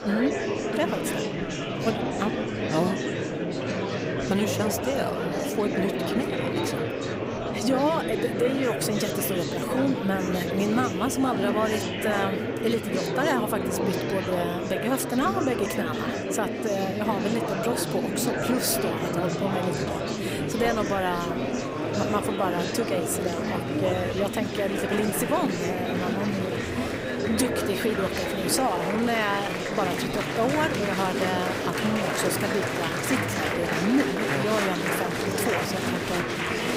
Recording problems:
murmuring crowd; very loud; throughout; as loud as the speech

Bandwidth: 15.5 kHz